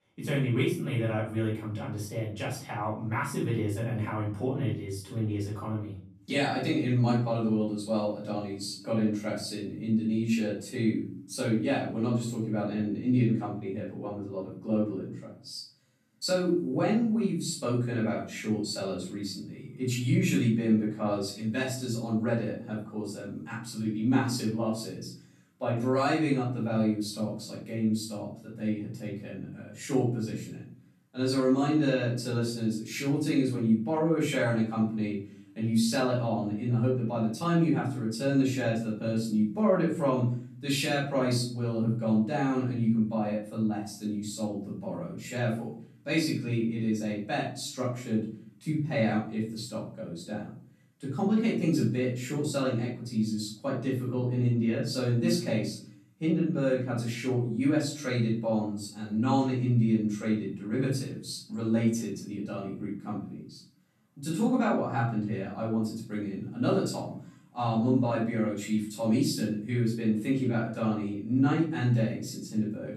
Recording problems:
off-mic speech; far
room echo; noticeable; dies away in 0.5 s

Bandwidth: 13.5 kHz